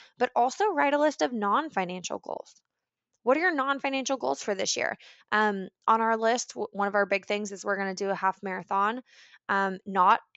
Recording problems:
high frequencies cut off; noticeable; nothing above 7.5 kHz

